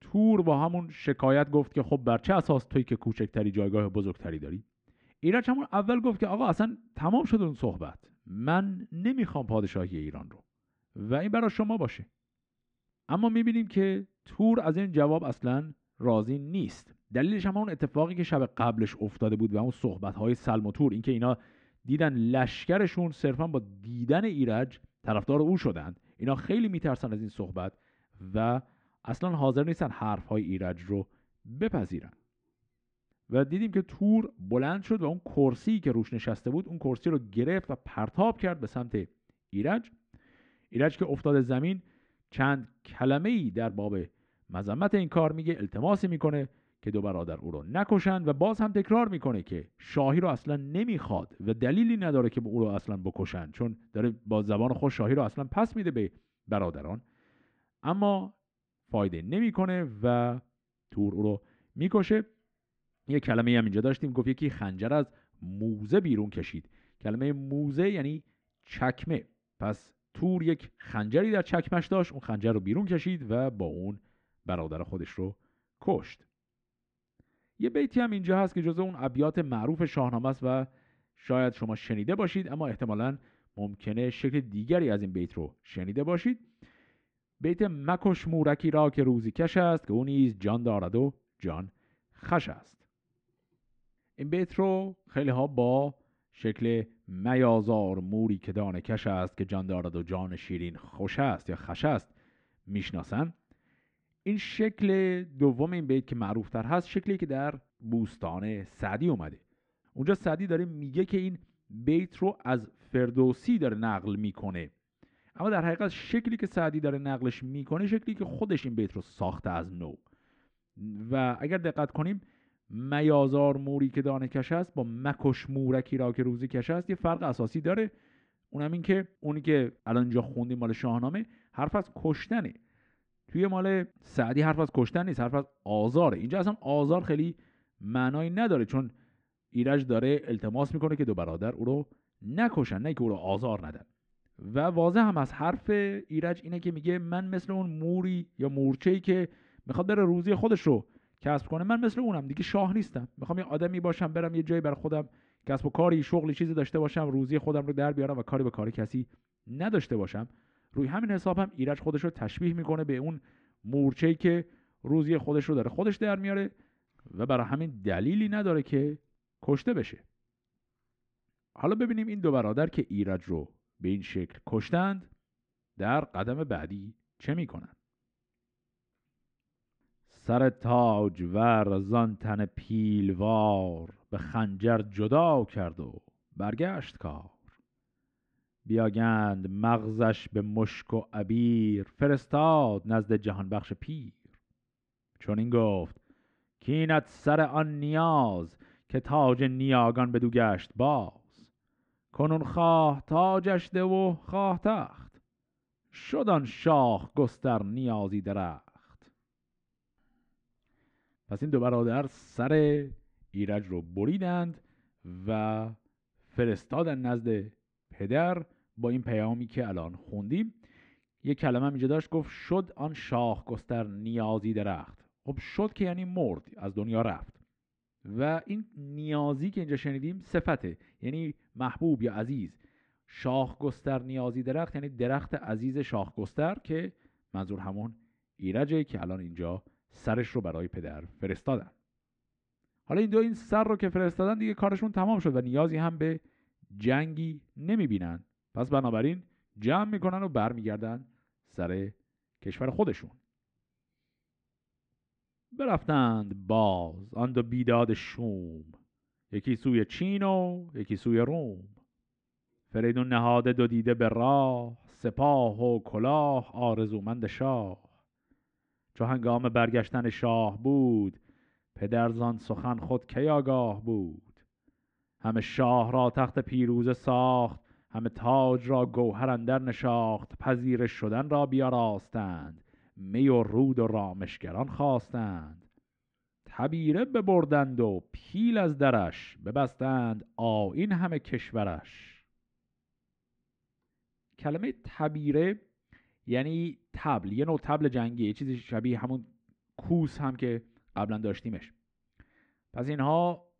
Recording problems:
muffled; slightly; fading above 2.5 kHz

